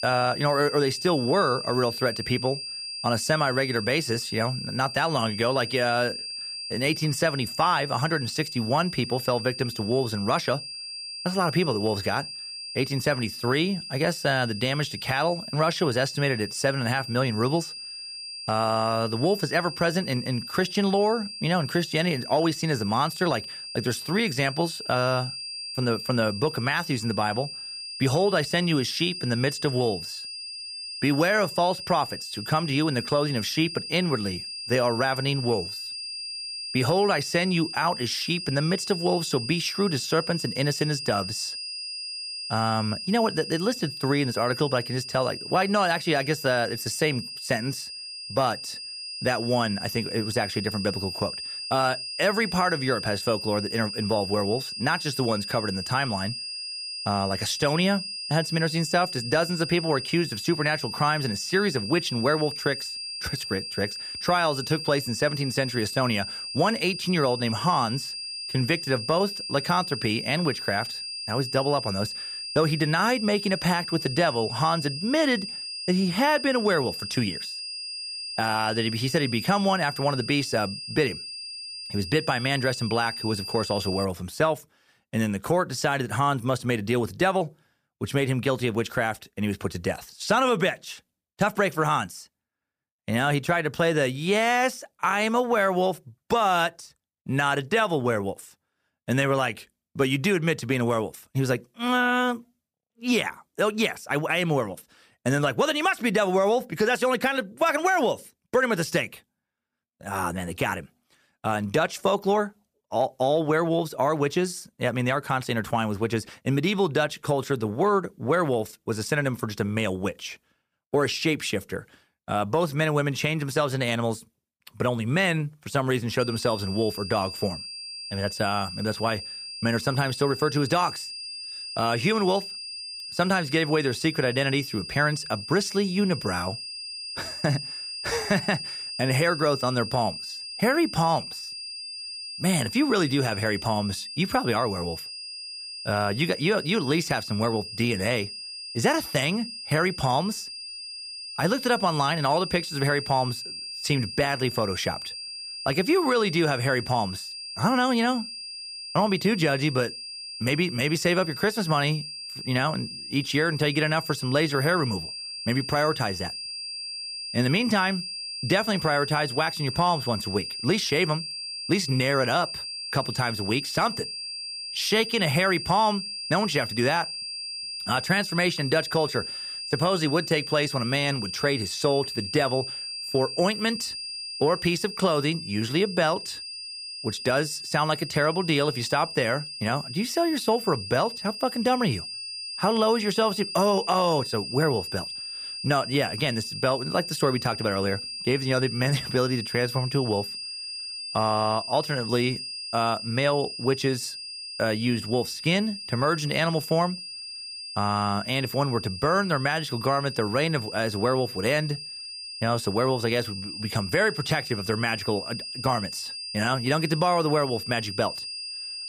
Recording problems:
high-pitched whine; loud; until 1:24 and from 2:06 on; 5 kHz, 7 dB below the speech

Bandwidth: 15 kHz